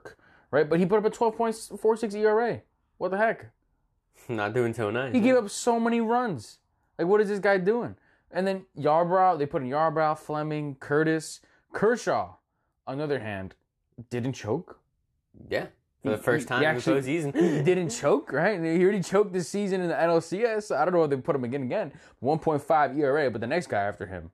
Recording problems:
none

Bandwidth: 13.5 kHz